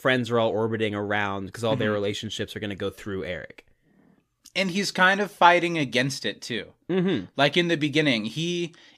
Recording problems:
none

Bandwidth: 15 kHz